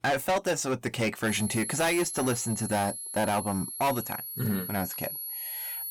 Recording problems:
distortion; heavy; 9% of the sound clipped
high-pitched whine; loud; from 1.5 s on; 11 kHz, 5 dB below the speech

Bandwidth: 18 kHz